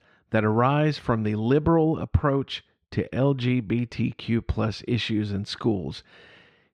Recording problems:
muffled; slightly; fading above 3 kHz

